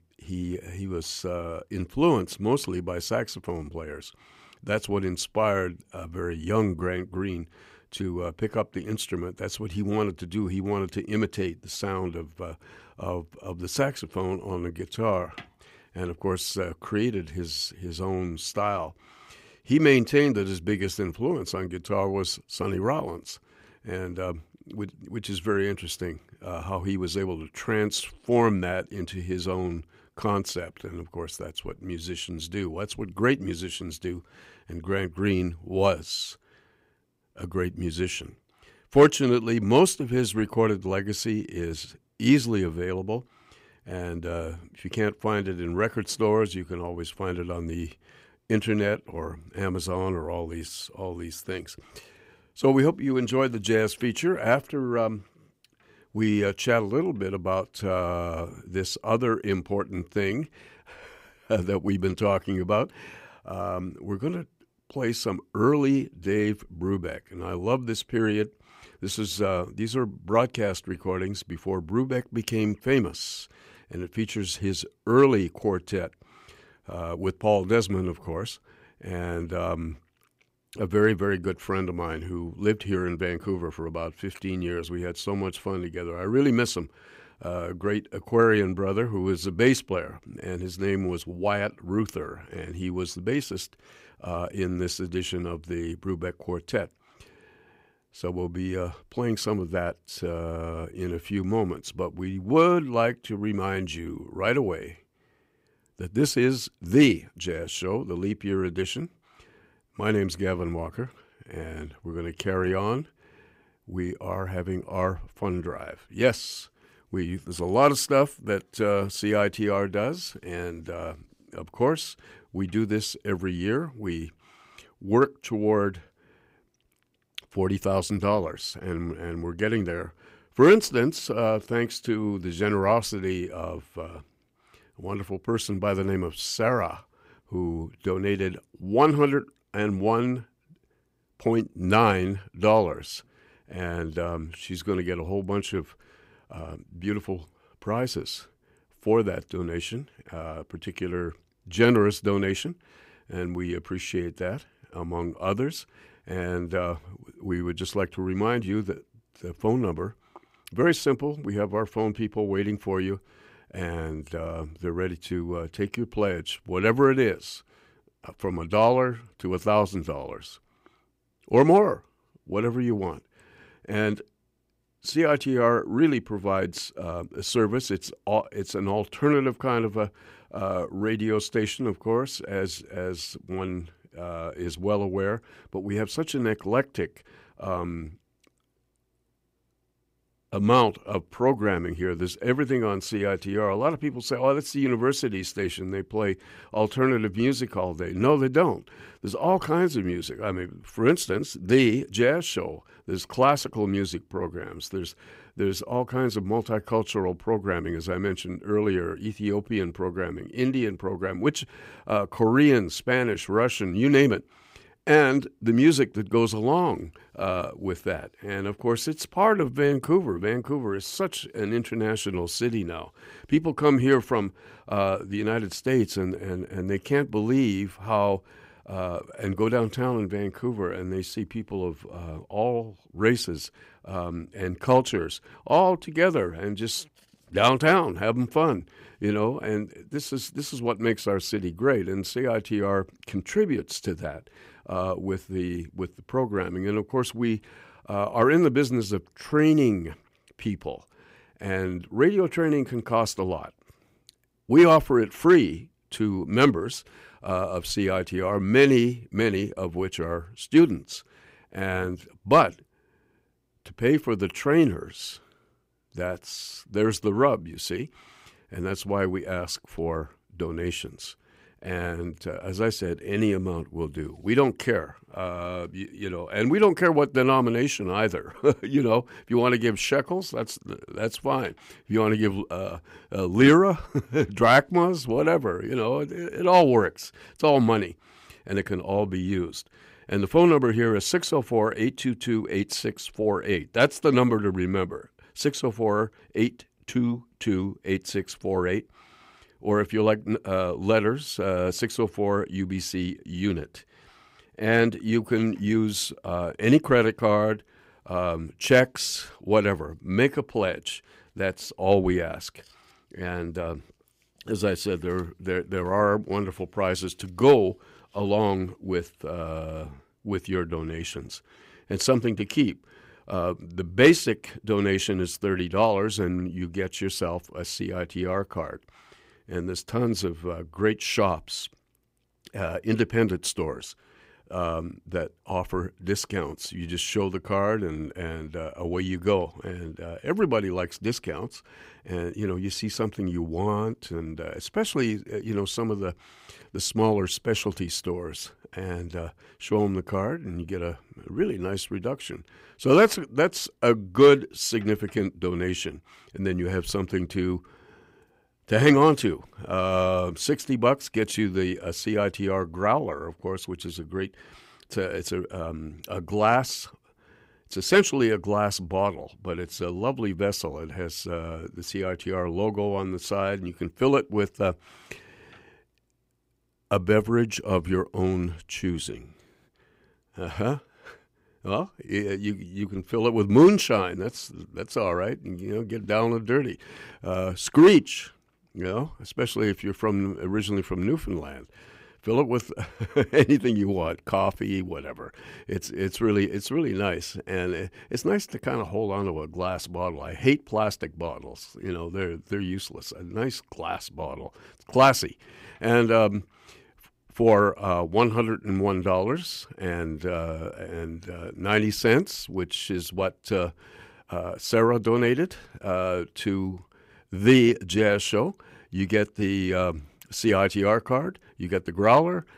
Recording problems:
none

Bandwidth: 15.5 kHz